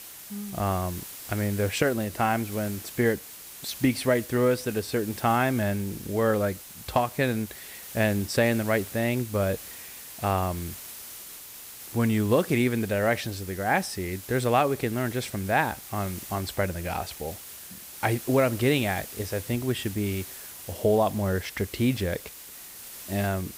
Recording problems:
hiss; noticeable; throughout; 15 dB below the speech

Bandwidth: 15.5 kHz